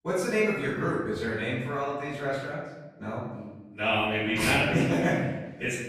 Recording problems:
room echo; strong; dies away in 1 s
off-mic speech; far

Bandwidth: 14.5 kHz